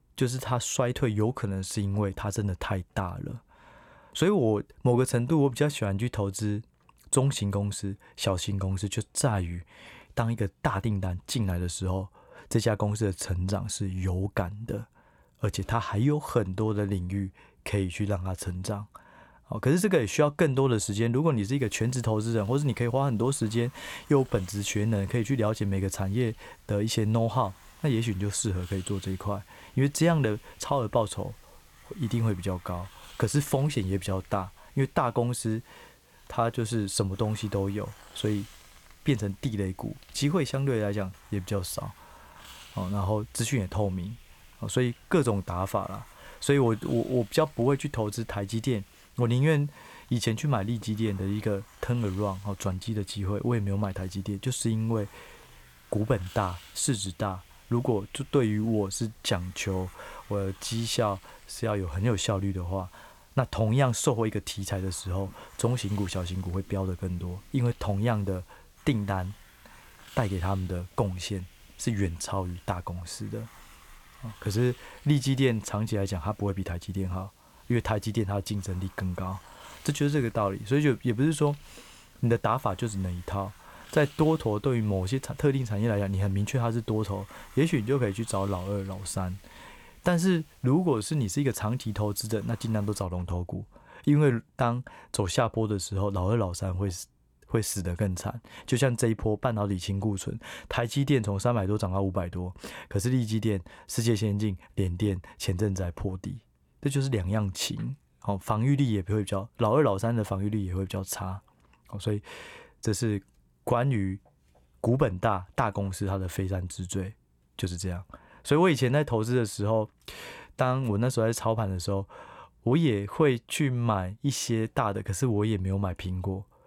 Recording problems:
hiss; faint; from 22 s to 1:33; 25 dB below the speech

